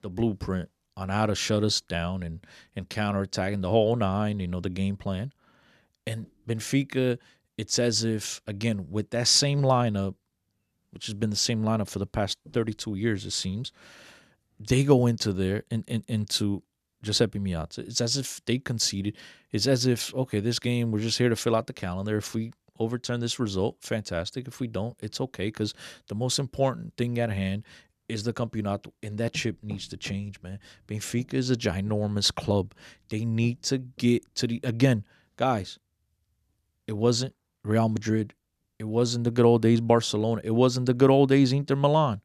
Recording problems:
none

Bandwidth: 14.5 kHz